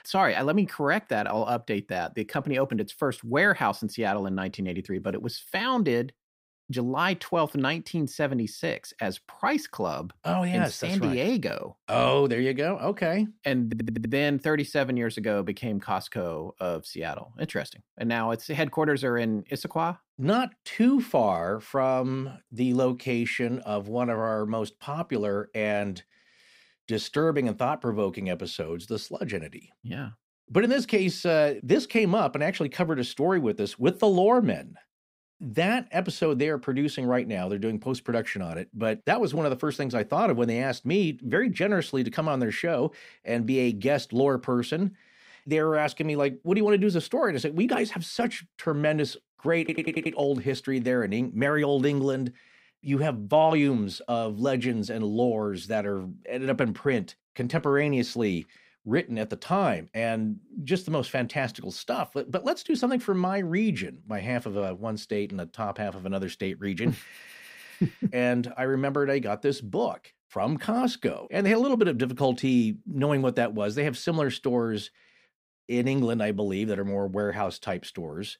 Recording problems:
audio stuttering; at 14 s, at 50 s and at 1:07

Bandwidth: 15.5 kHz